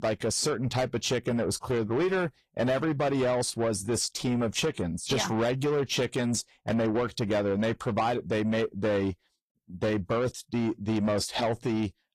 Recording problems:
distortion; slight; 10 dB below the speech
garbled, watery; slightly; nothing above 14.5 kHz

